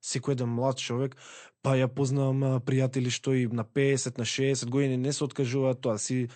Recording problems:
garbled, watery; slightly; nothing above 8.5 kHz

